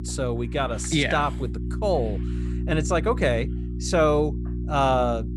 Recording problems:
electrical hum; noticeable; throughout; 60 Hz, 15 dB below the speech

